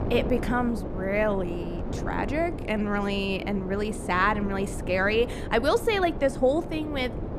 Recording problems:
wind noise on the microphone; occasional gusts; 10 dB below the speech

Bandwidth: 14.5 kHz